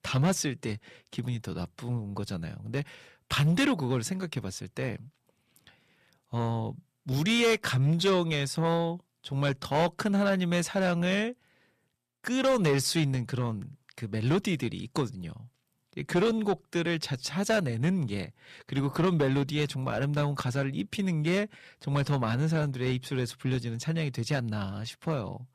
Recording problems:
distortion; slight; 10 dB below the speech

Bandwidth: 14.5 kHz